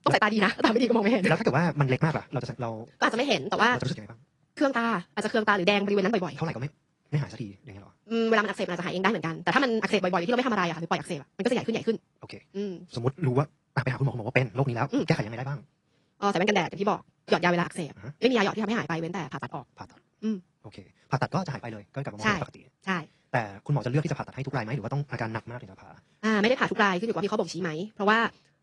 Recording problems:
wrong speed, natural pitch; too fast; 1.7 times normal speed
garbled, watery; slightly

